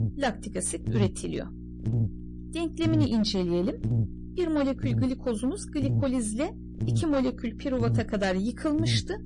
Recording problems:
distortion; slight; 5% of the sound clipped
garbled, watery; slightly
electrical hum; noticeable; throughout; 60 Hz, 10 dB below the speech

